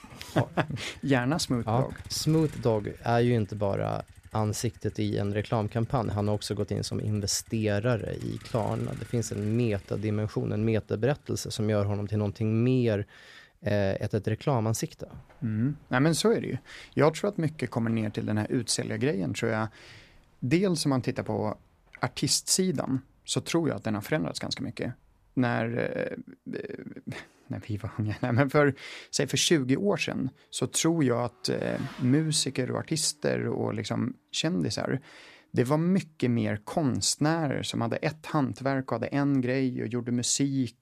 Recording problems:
traffic noise; faint; throughout; 25 dB below the speech

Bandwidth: 14.5 kHz